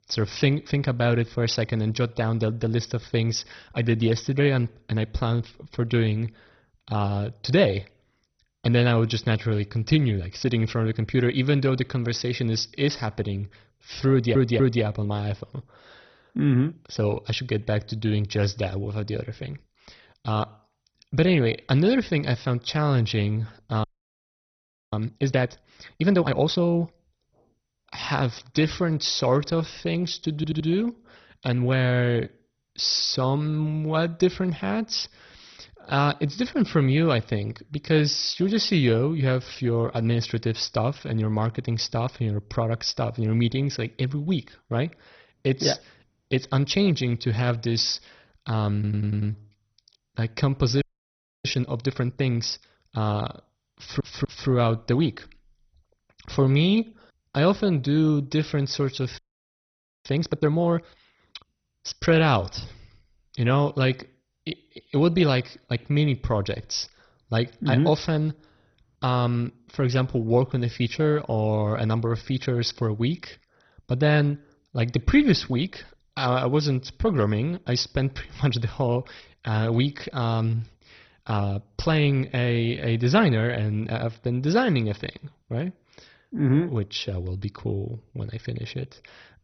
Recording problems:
garbled, watery; badly; nothing above 6 kHz
audio stuttering; 4 times, first at 14 s
audio freezing; at 24 s for 1 s, at 51 s for 0.5 s and at 59 s for 1 s

